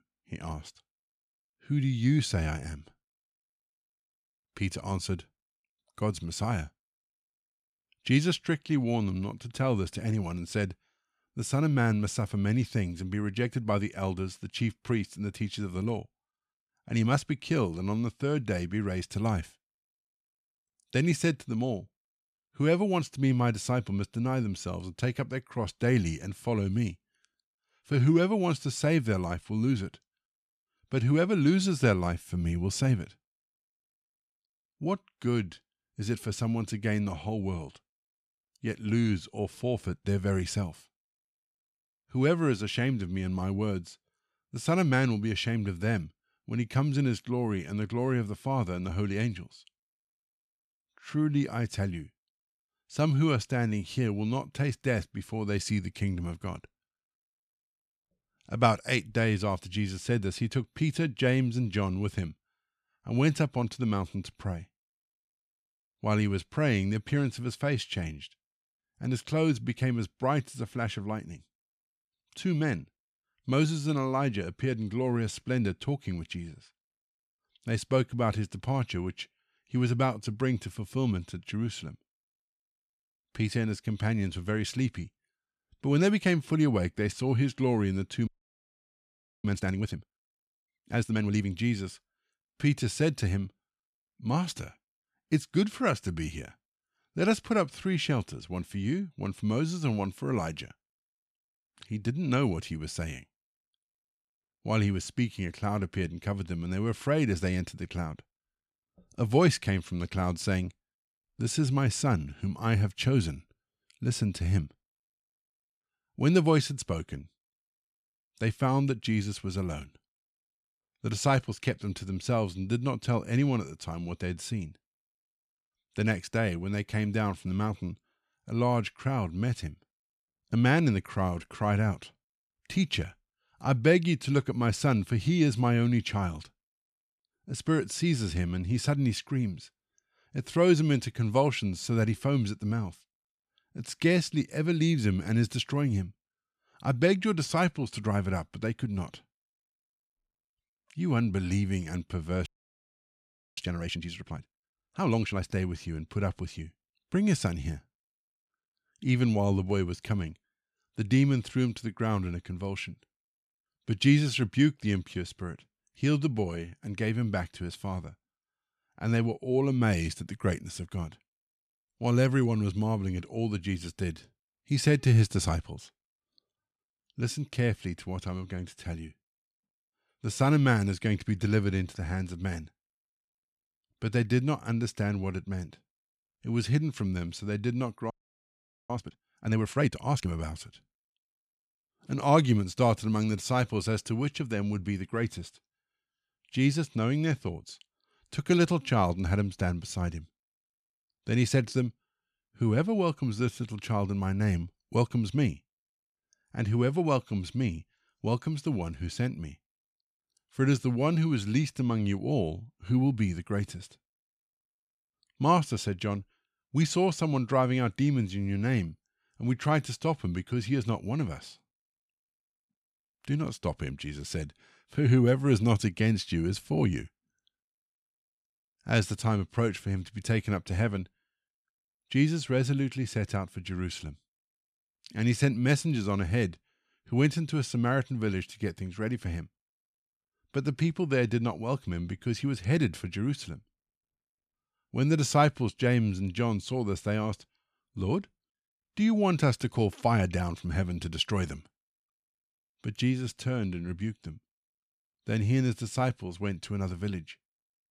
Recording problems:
audio freezing; at 1:28 for 1 s, at 2:32 for 1 s and at 3:08 for 1 s

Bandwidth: 14.5 kHz